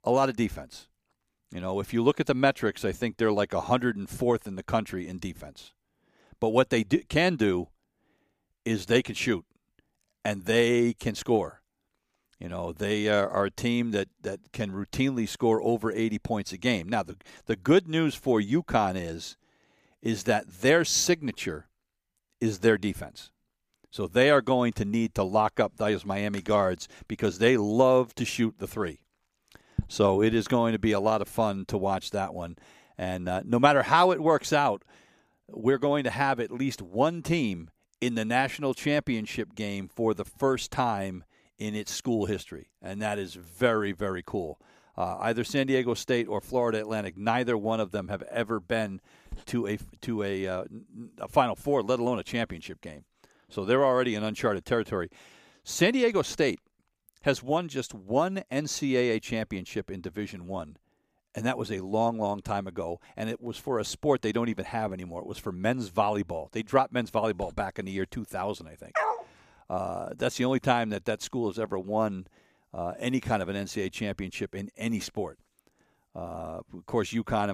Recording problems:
dog barking; noticeable; at 1:09; peak 1 dB below the speech
abrupt cut into speech; at the end

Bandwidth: 15 kHz